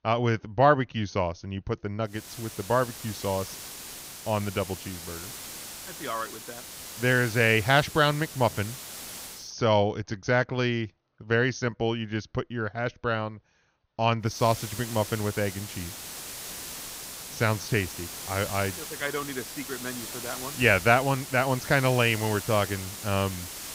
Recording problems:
high frequencies cut off; noticeable; nothing above 6.5 kHz
hiss; noticeable; from 2 to 9.5 s and from 14 s on; 10 dB below the speech

